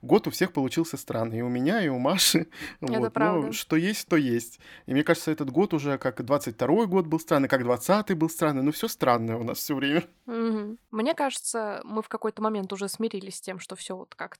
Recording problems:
none

